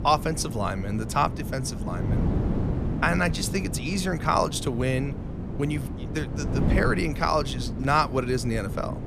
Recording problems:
wind noise on the microphone; occasional gusts; 10 dB below the speech

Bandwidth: 14.5 kHz